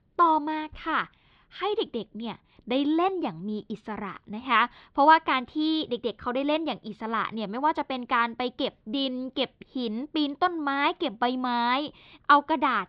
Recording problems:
muffled; very slightly; fading above 4 kHz

